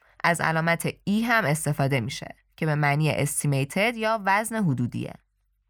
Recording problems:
none

